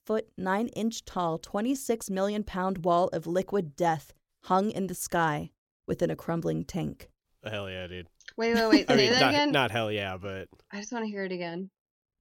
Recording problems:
none

